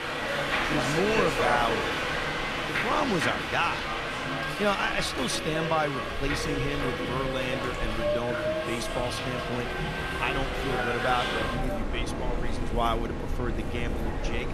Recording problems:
train or aircraft noise; very loud; throughout; 1 dB above the speech
chatter from many people; faint; throughout; 20 dB below the speech

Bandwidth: 13.5 kHz